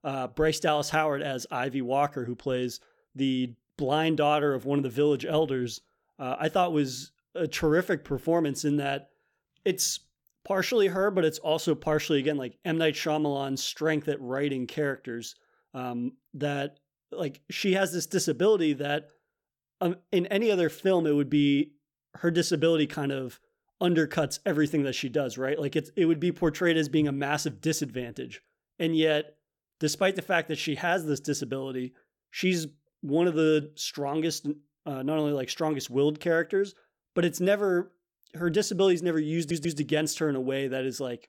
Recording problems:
audio stuttering; at 39 s

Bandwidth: 17 kHz